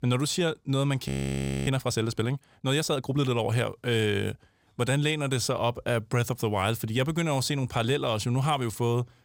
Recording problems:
audio freezing; at 1 s for 0.5 s

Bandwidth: 16.5 kHz